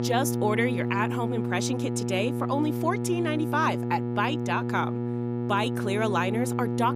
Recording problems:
electrical hum; loud; throughout; 60 Hz, 7 dB below the speech

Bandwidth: 15.5 kHz